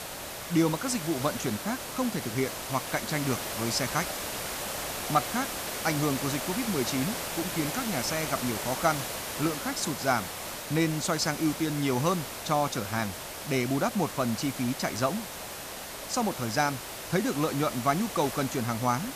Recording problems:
hiss; loud; throughout; 5 dB below the speech

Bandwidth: 14.5 kHz